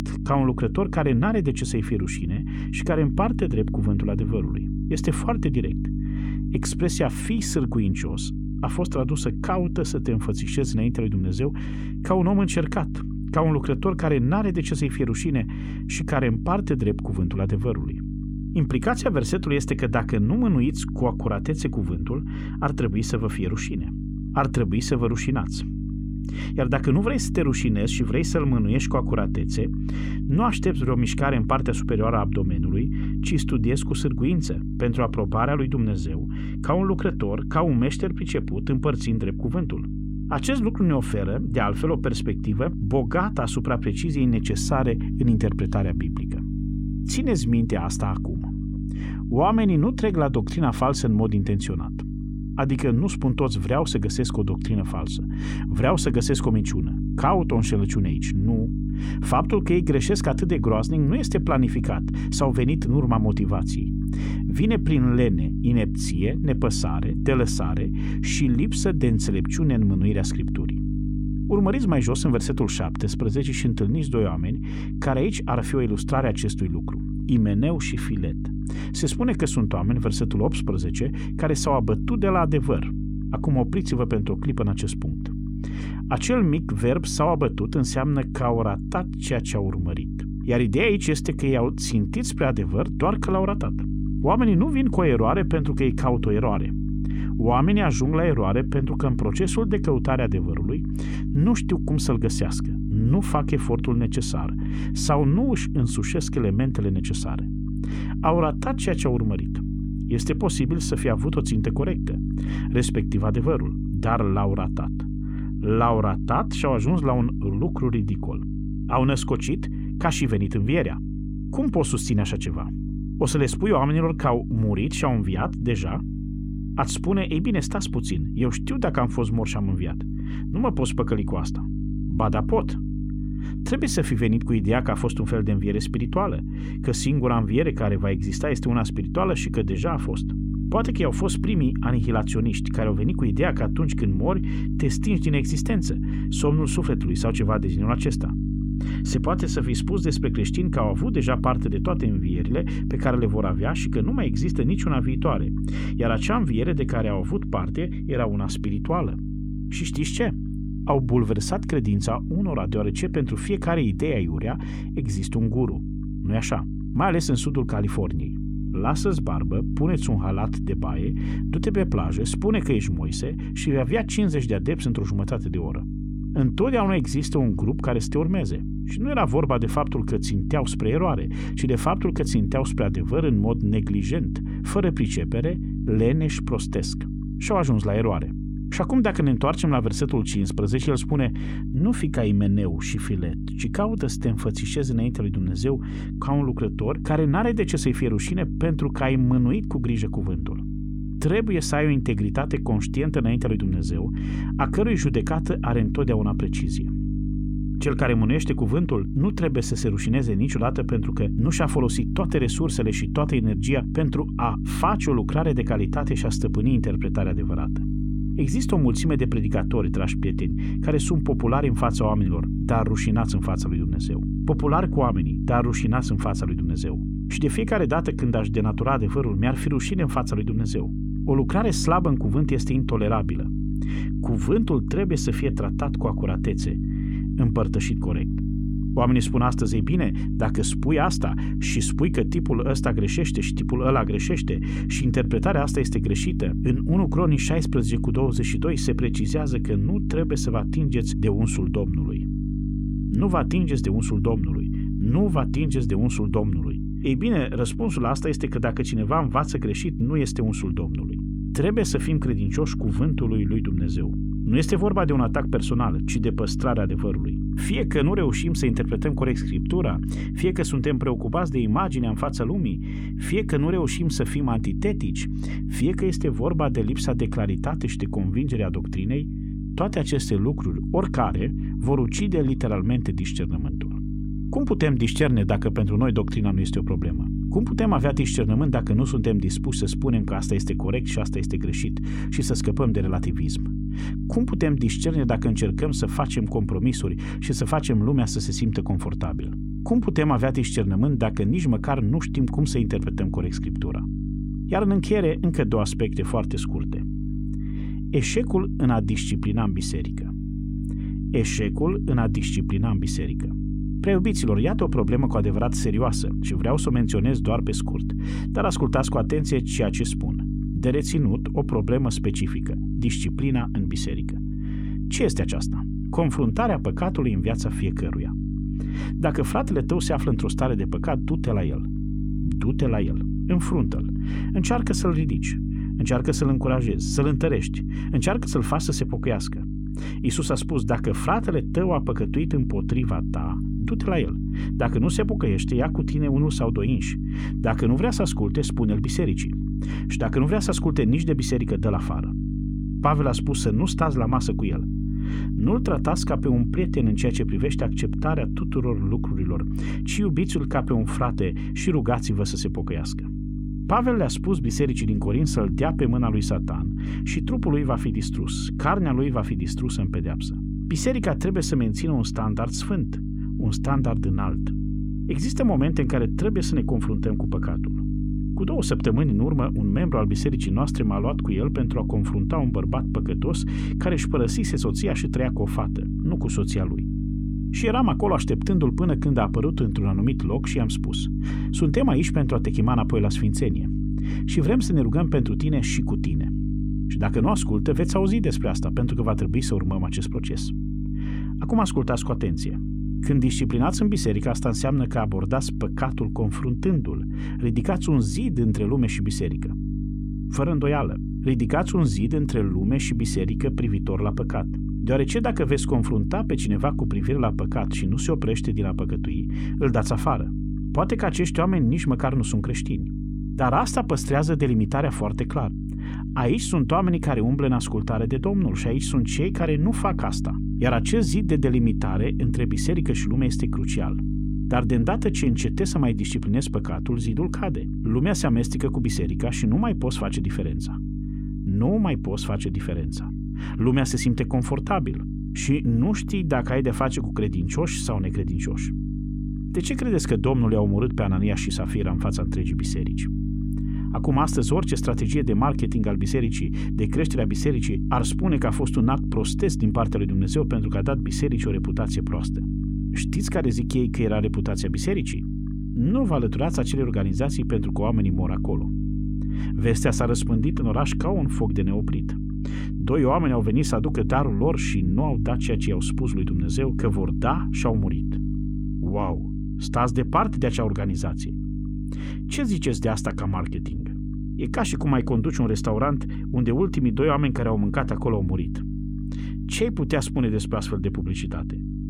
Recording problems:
electrical hum; loud; throughout; 50 Hz, 8 dB below the speech

